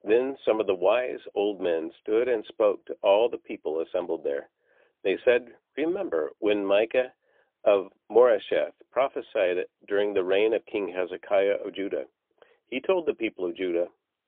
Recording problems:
phone-call audio; poor line; nothing above 3.5 kHz

